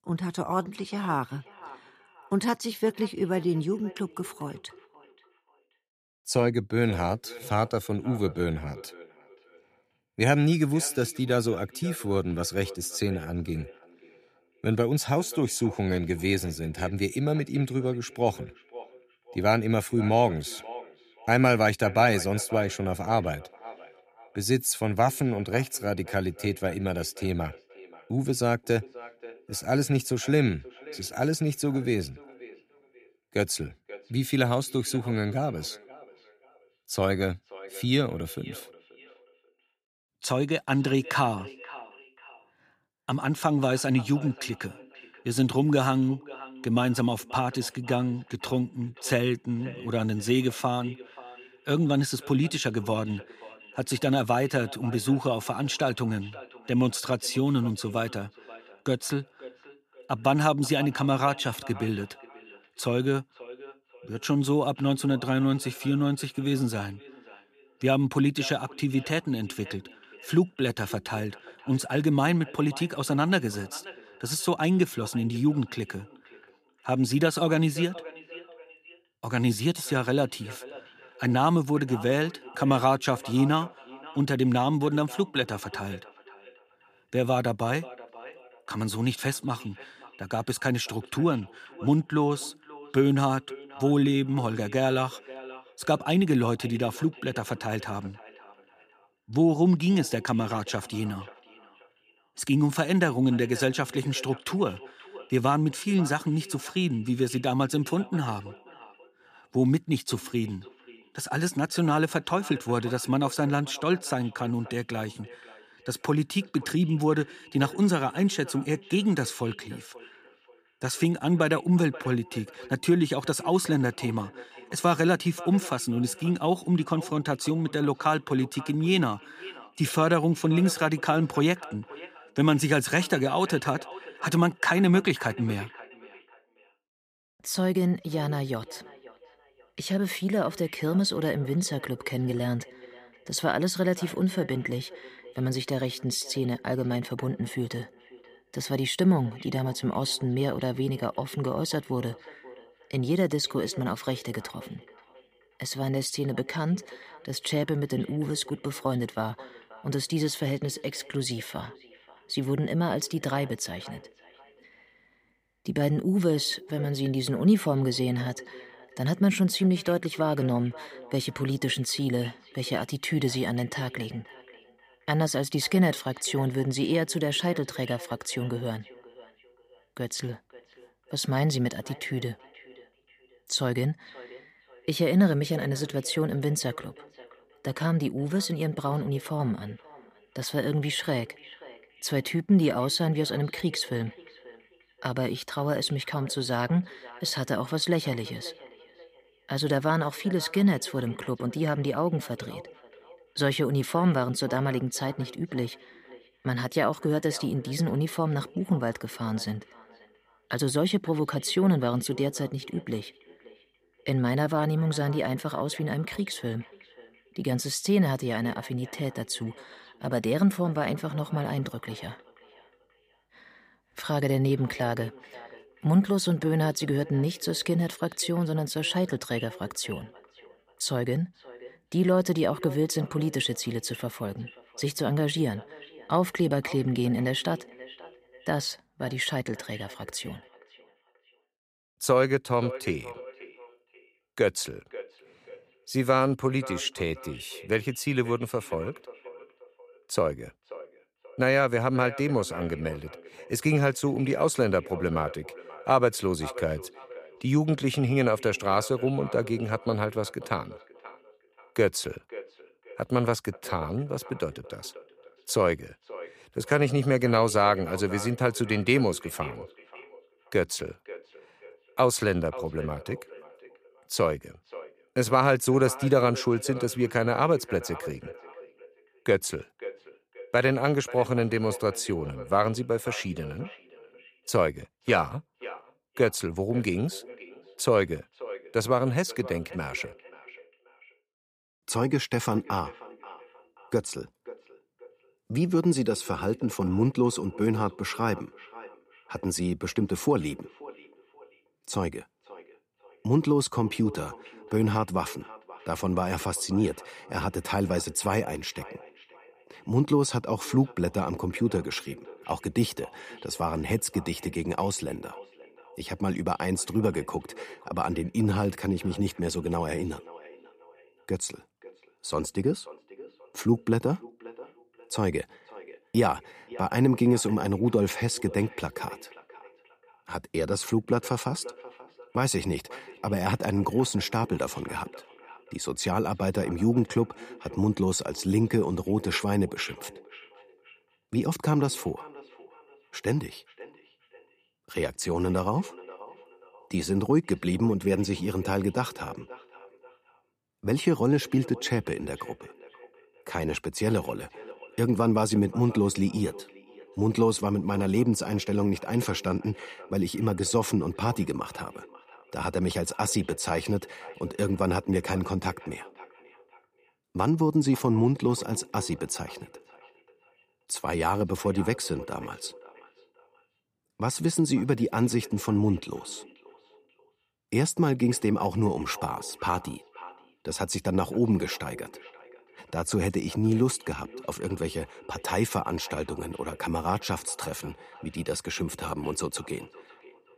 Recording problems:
echo of what is said; faint; throughout; 530 ms later, 20 dB below the speech

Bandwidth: 15 kHz